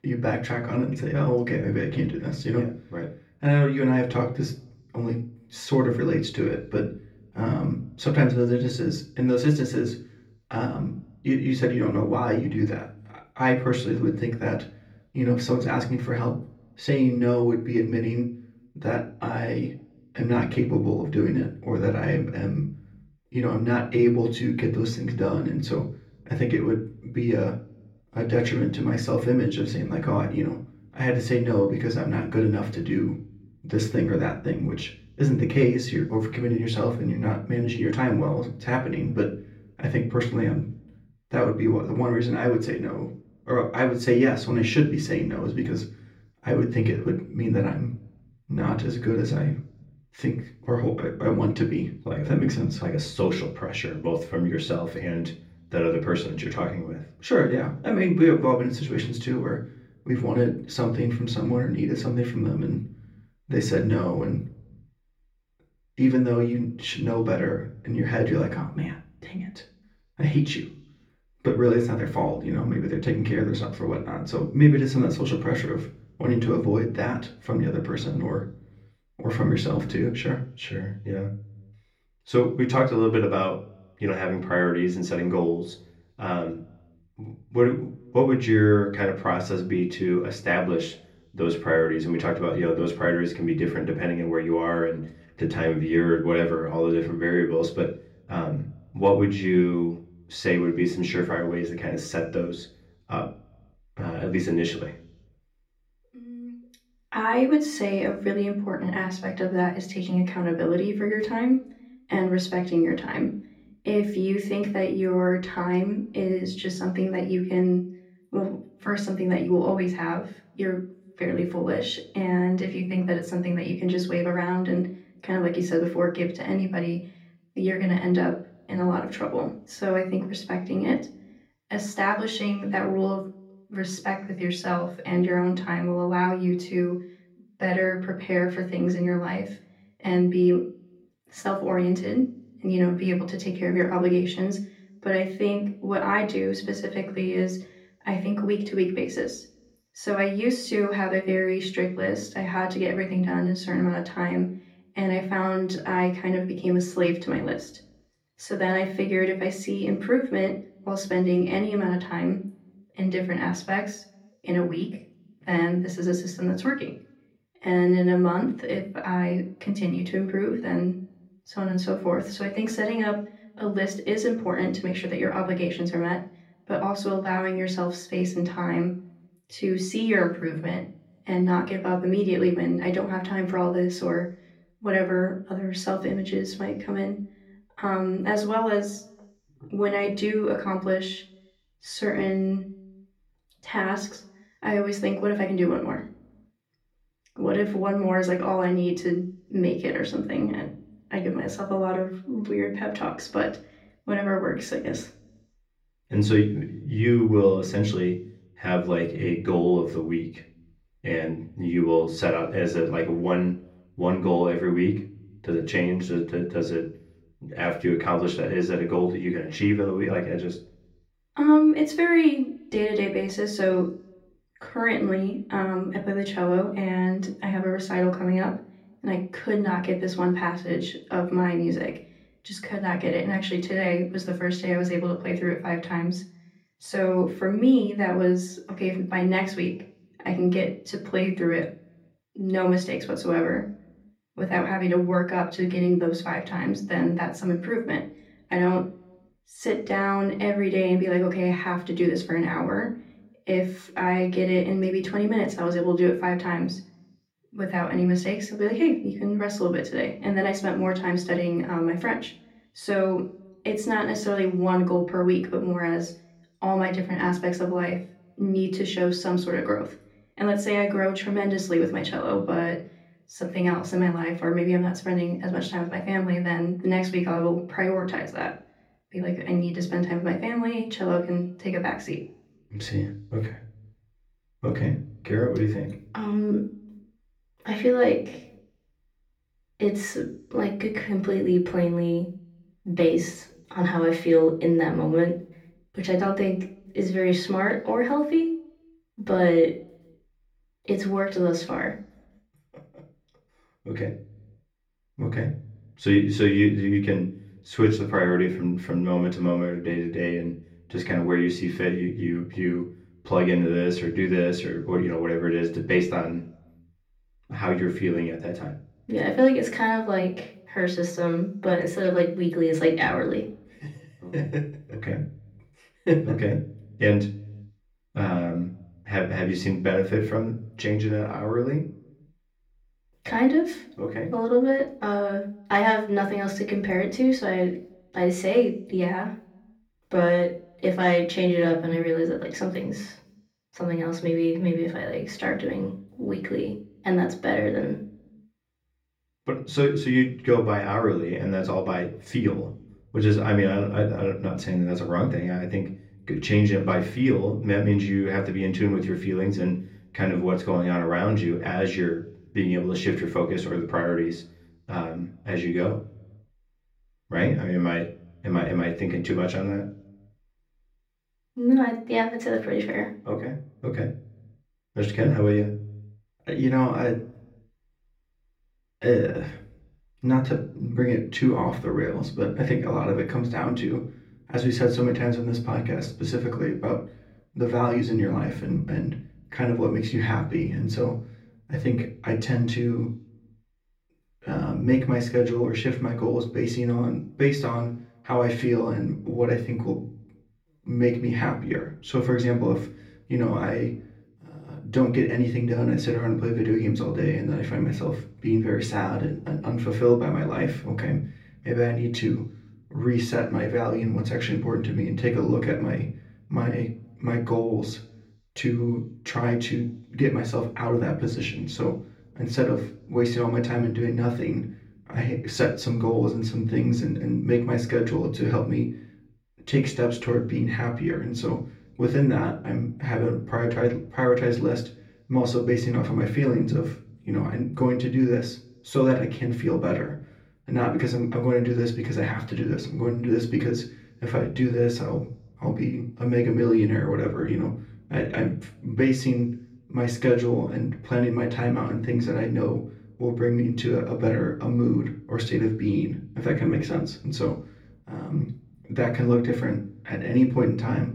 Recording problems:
off-mic speech; far
room echo; slight; dies away in 0.5 s

